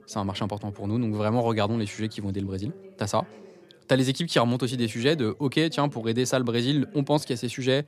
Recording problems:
background chatter; faint; throughout; 2 voices, 25 dB below the speech

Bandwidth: 14.5 kHz